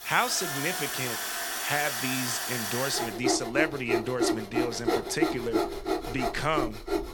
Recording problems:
machinery noise; very loud; throughout; 1 dB above the speech

